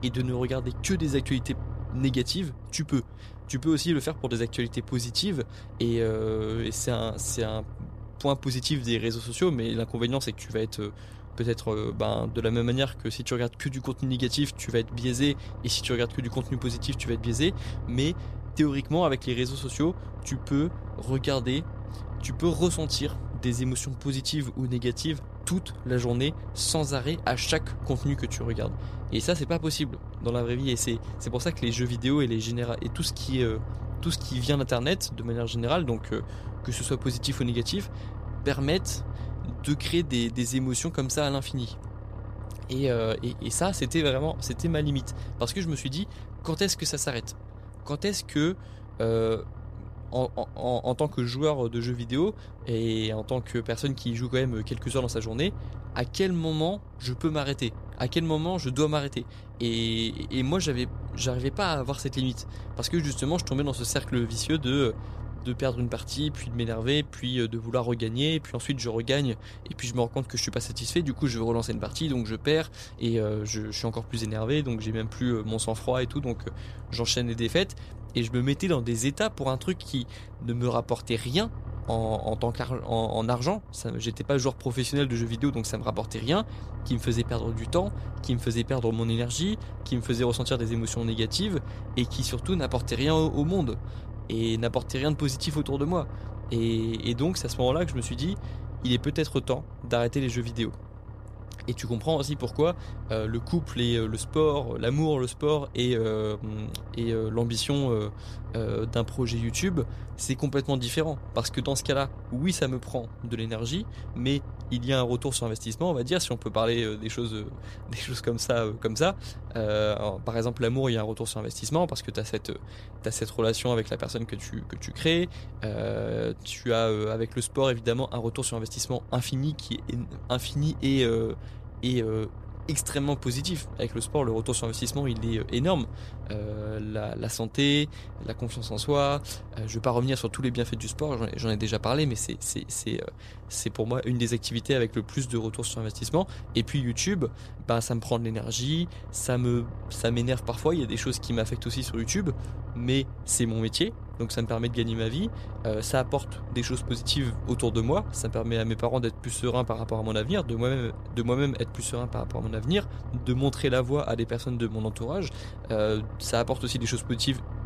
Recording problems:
low rumble; noticeable; throughout; 20 dB below the speech

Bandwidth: 14.5 kHz